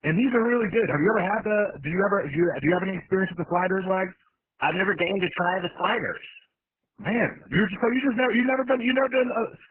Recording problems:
garbled, watery; badly; nothing above 3 kHz

